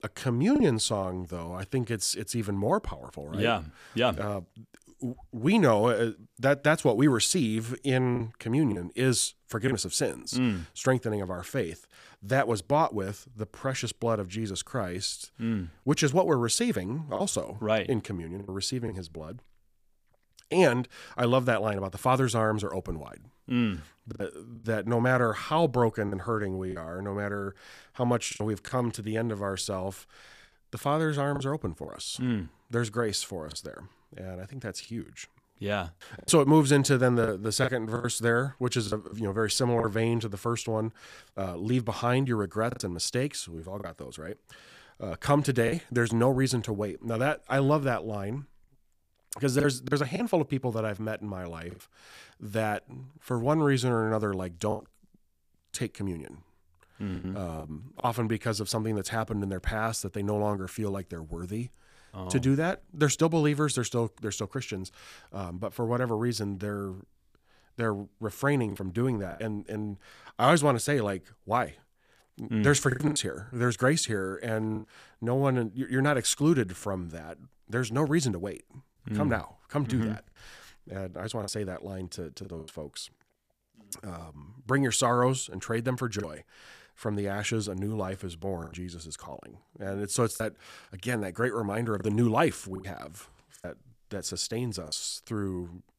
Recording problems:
choppy; occasionally; 4% of the speech affected

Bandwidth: 15 kHz